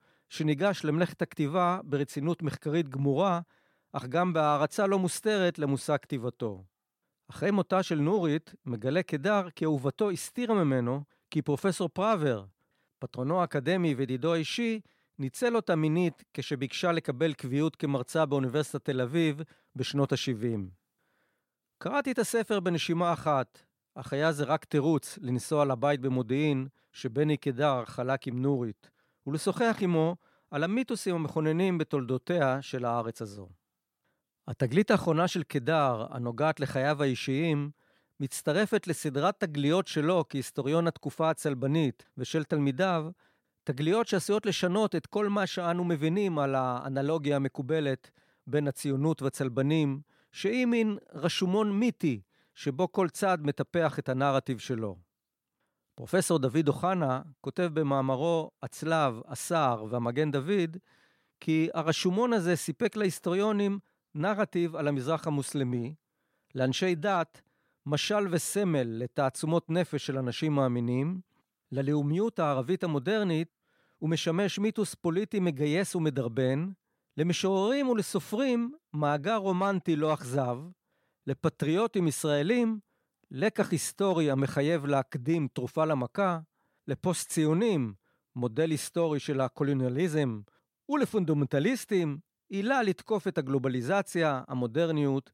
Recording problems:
none

